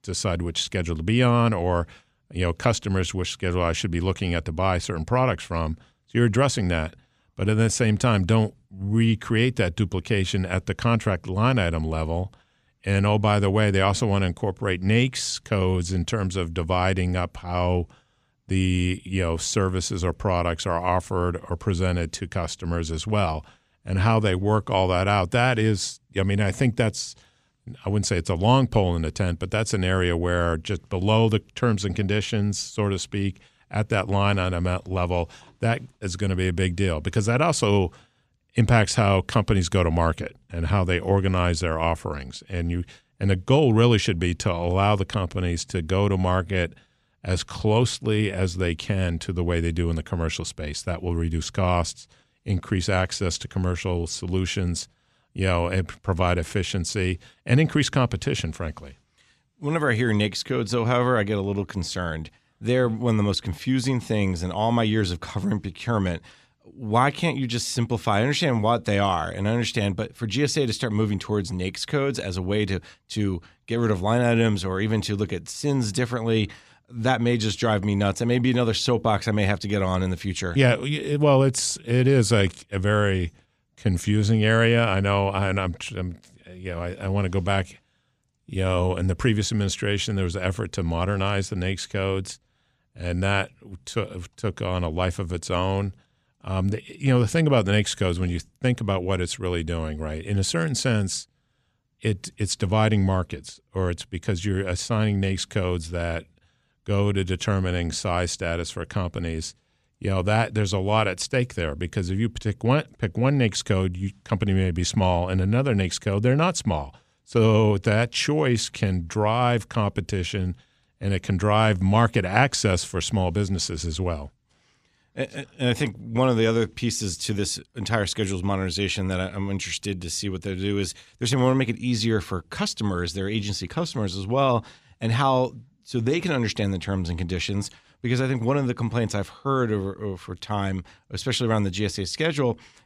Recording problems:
none

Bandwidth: 14.5 kHz